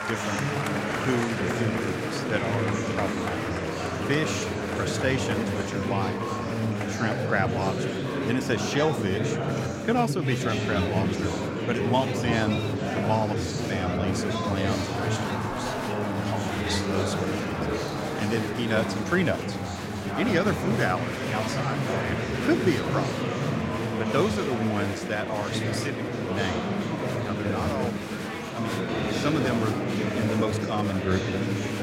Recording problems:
chatter from many people; very loud; throughout; 1 dB above the speech

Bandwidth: 16 kHz